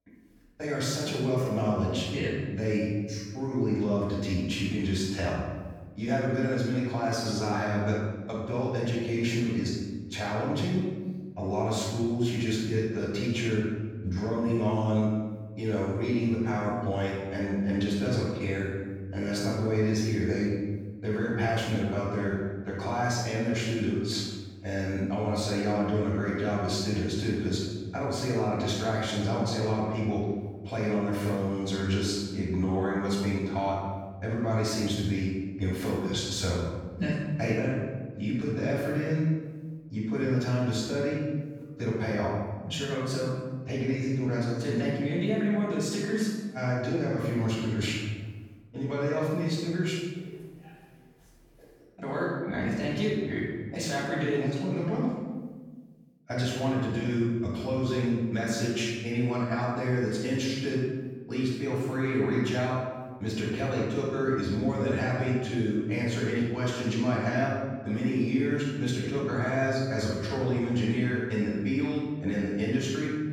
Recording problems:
room echo; strong; dies away in 1.3 s
off-mic speech; far

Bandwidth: 18 kHz